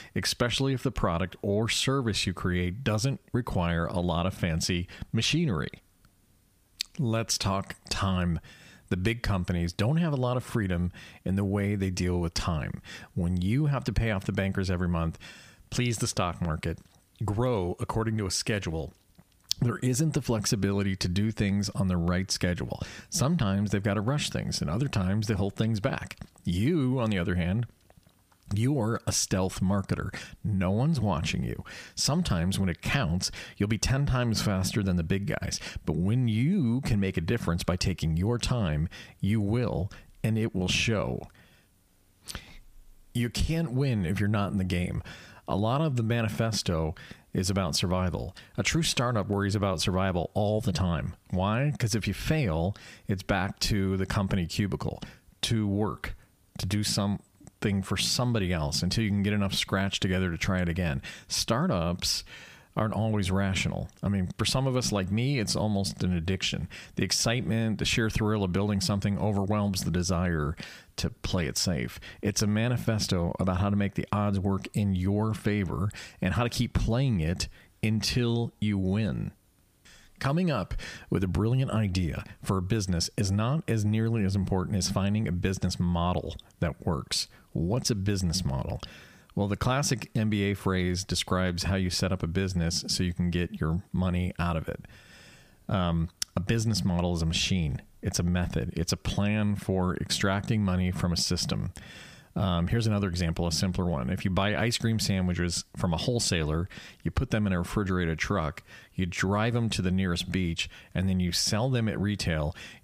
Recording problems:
squashed, flat; somewhat

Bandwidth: 15 kHz